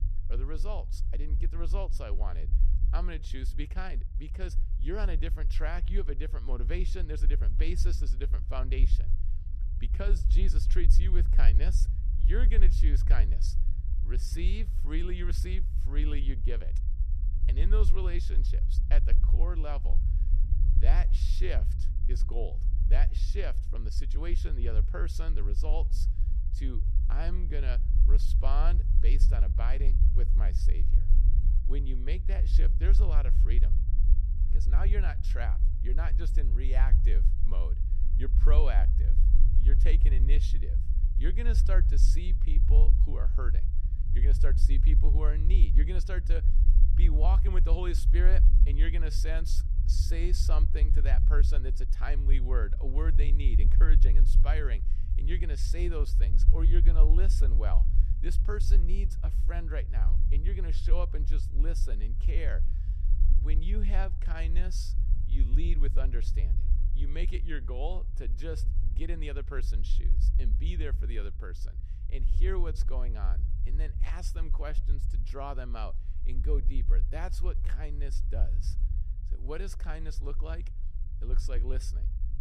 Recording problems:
low rumble; loud; throughout; 8 dB below the speech

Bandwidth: 14 kHz